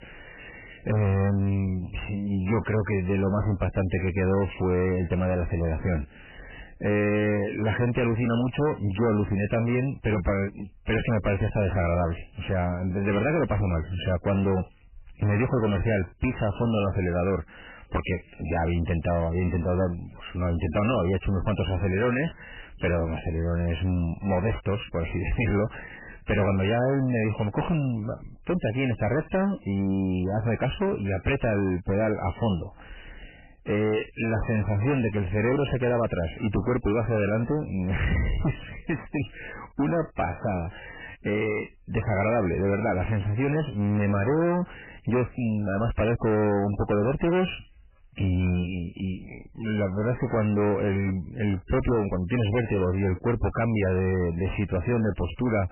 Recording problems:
distortion; heavy; 5 dB below the speech
garbled, watery; badly; nothing above 3 kHz

